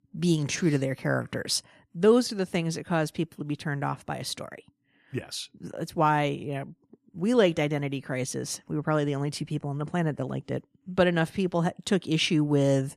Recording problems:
none

